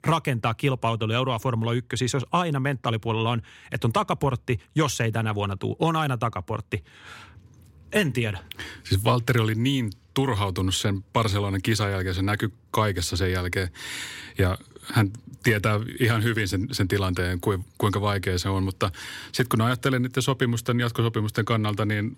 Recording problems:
none

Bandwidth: 16 kHz